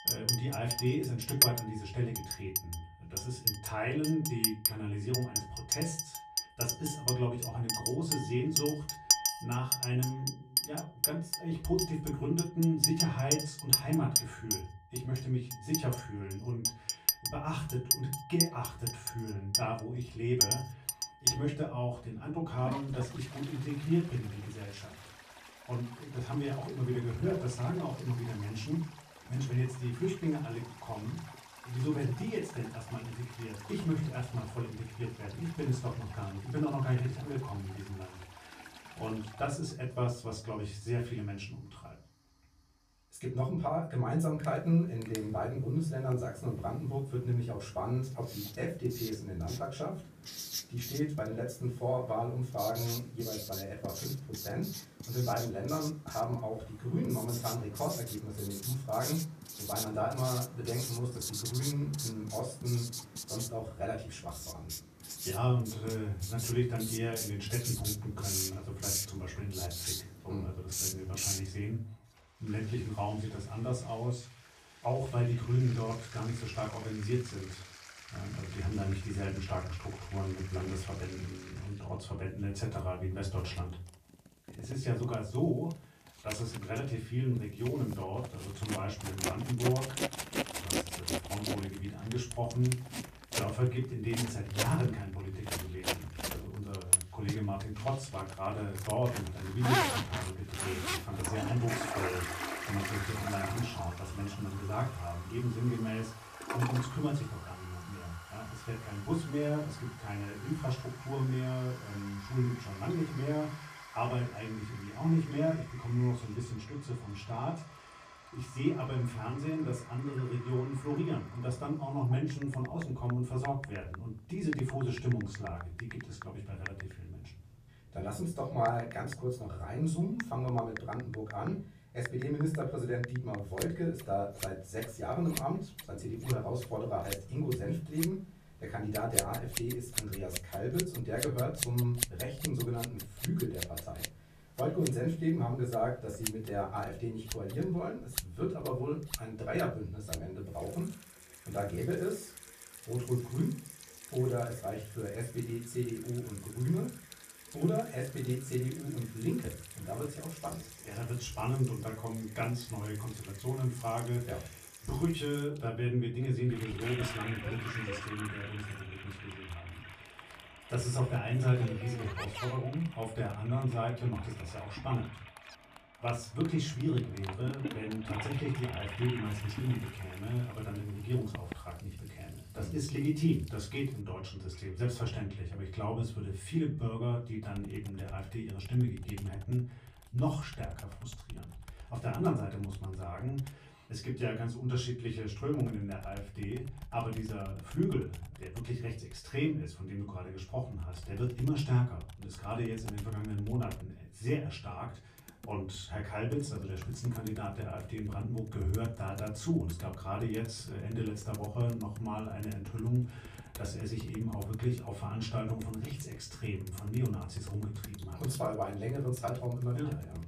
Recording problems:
off-mic speech; far
room echo; slight; dies away in 0.3 s
household noises; loud; throughout; 2 dB below the speech

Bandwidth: 14.5 kHz